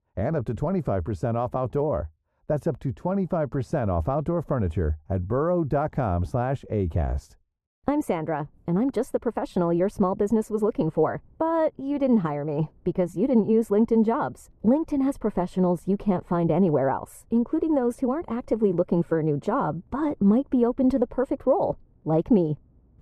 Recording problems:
muffled; very; fading above 1.5 kHz

